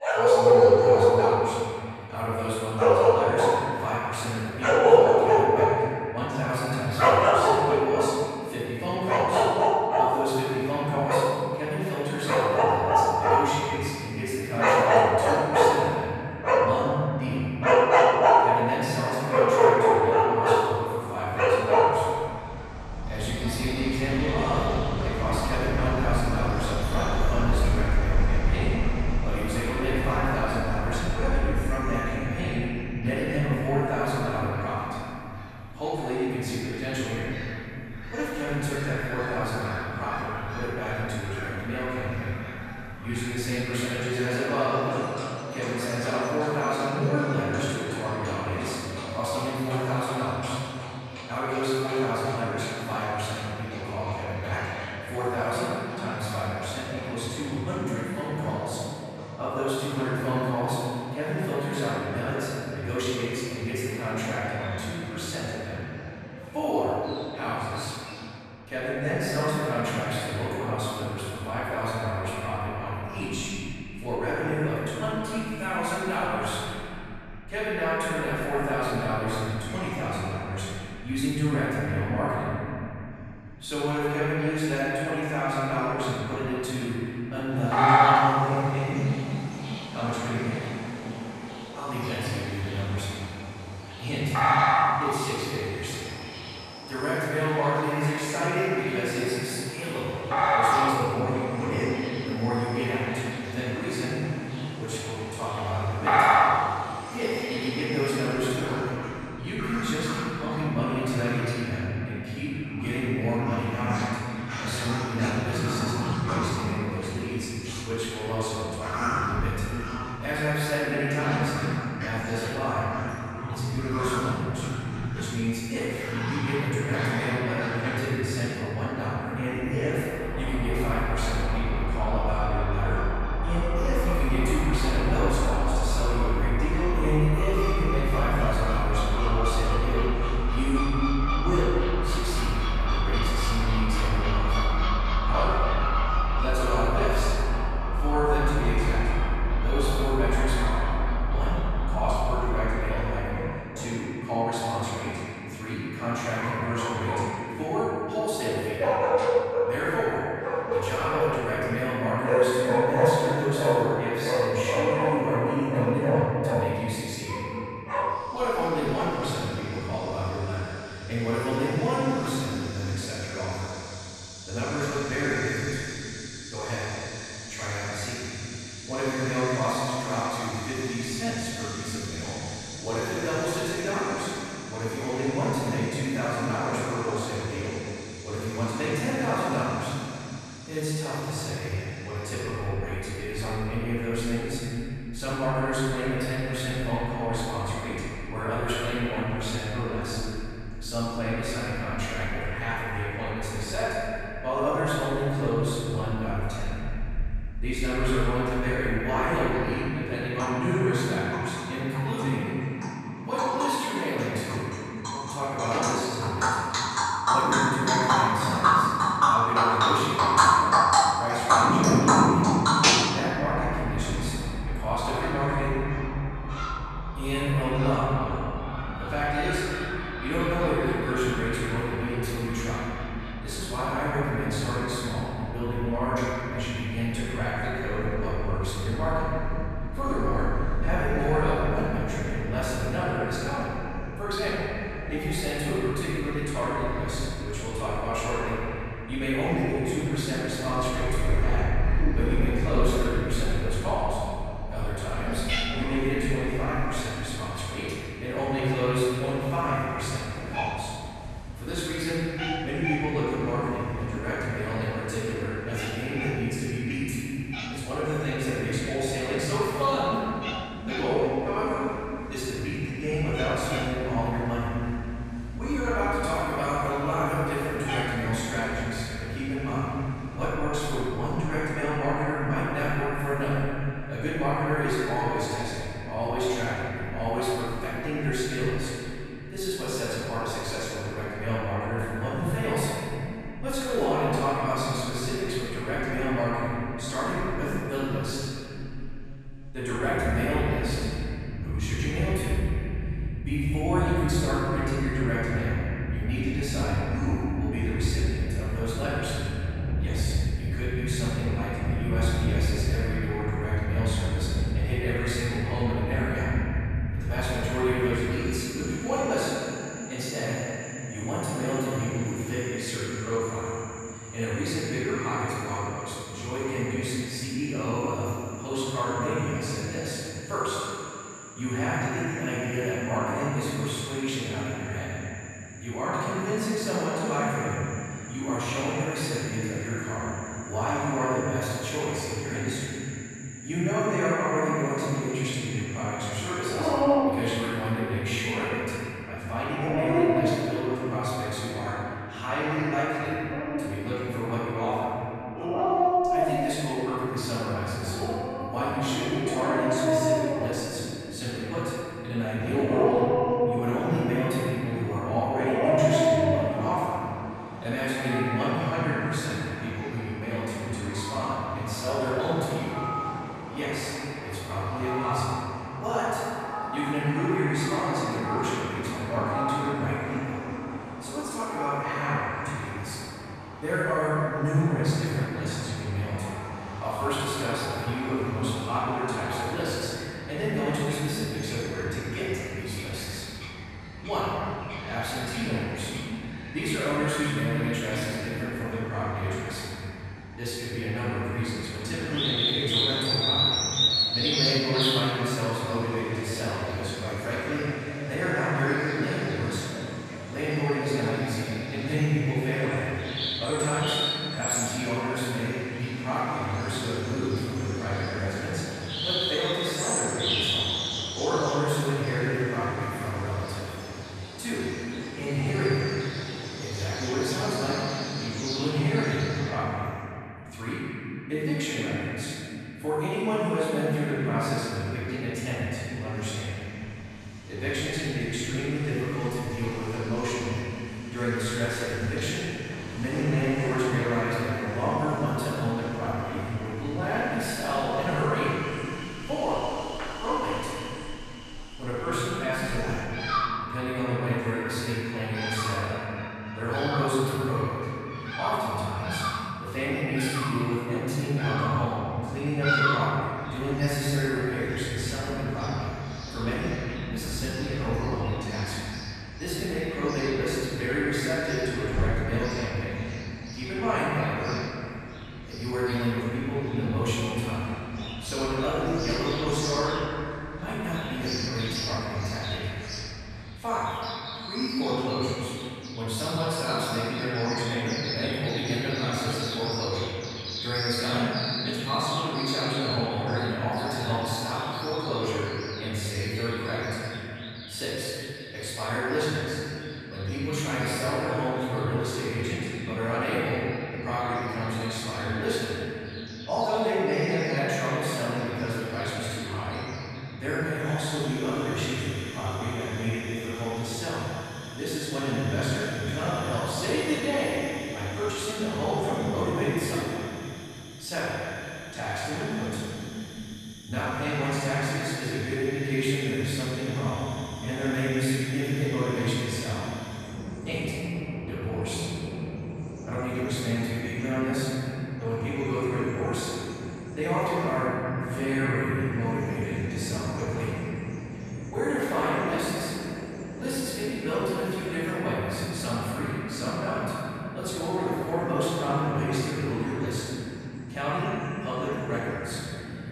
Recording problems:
room echo; strong; dies away in 3 s
off-mic speech; far
animal sounds; very loud; throughout; as loud as the speech

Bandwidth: 13.5 kHz